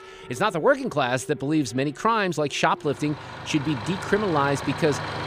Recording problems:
traffic noise; noticeable; throughout; 10 dB below the speech

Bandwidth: 15 kHz